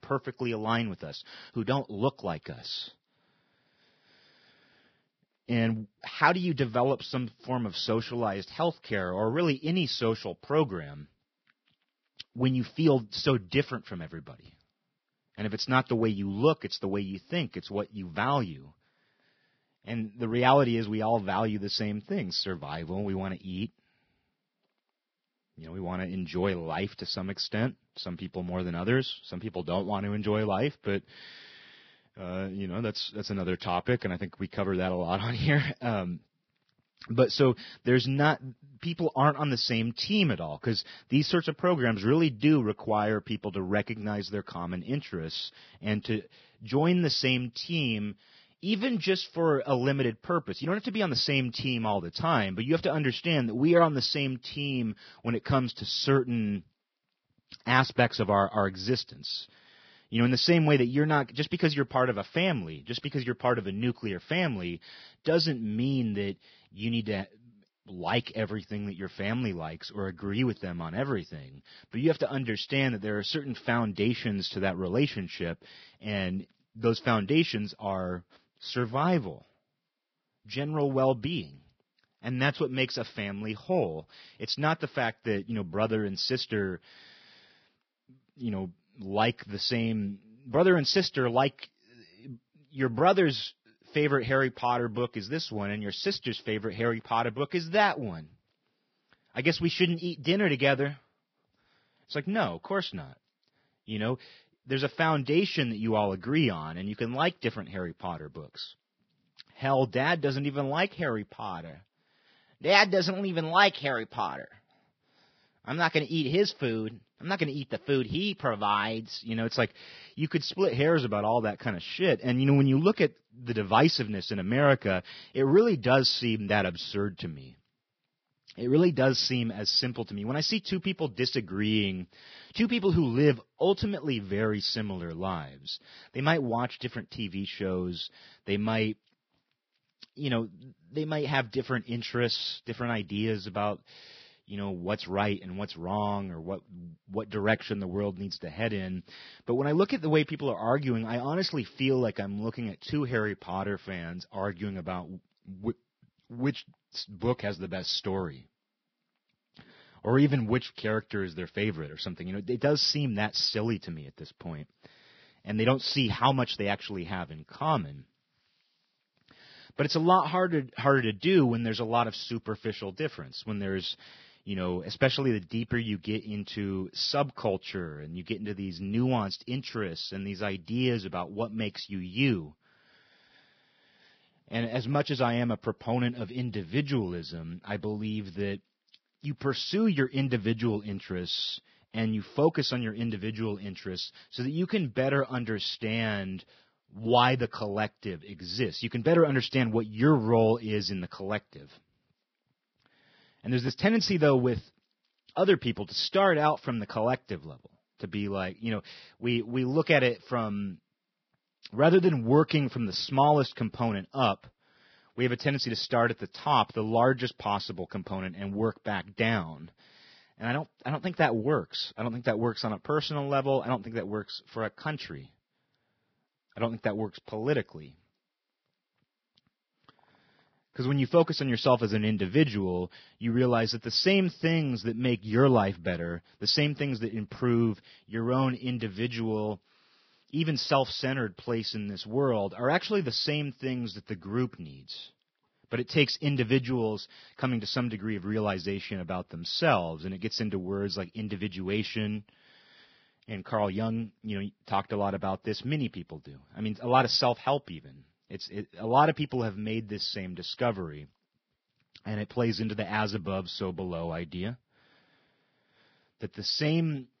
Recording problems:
garbled, watery; badly; nothing above 5.5 kHz

